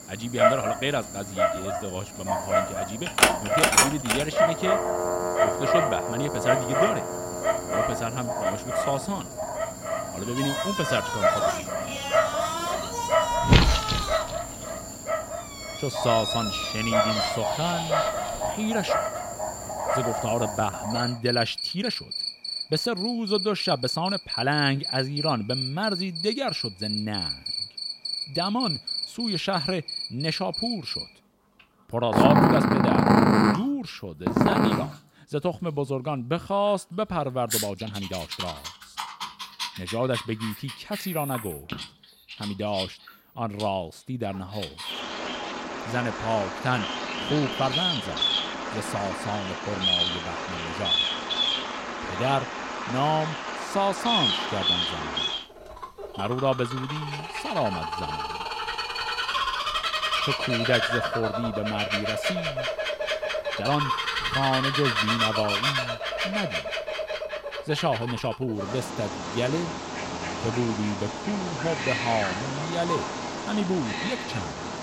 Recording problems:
animal sounds; very loud; throughout; 3 dB above the speech
uneven, jittery; strongly; from 1.5 s to 1:14

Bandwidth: 16 kHz